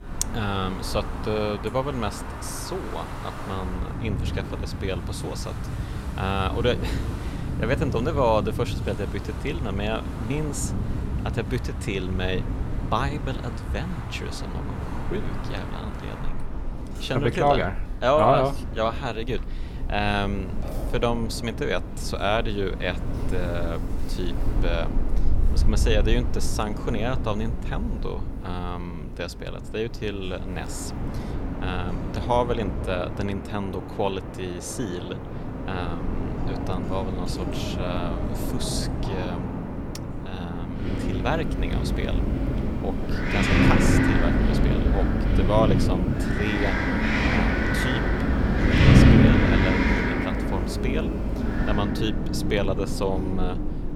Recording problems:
wind in the background; very loud; throughout; 2 dB above the speech

